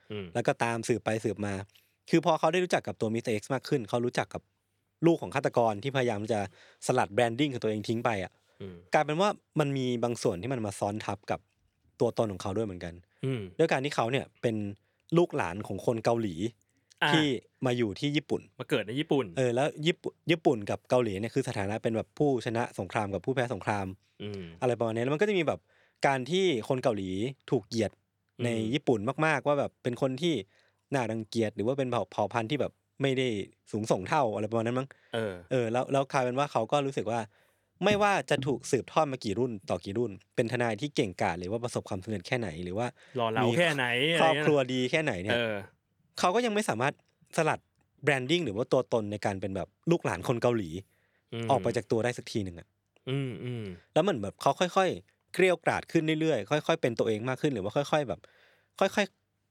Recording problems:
none

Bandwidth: 18.5 kHz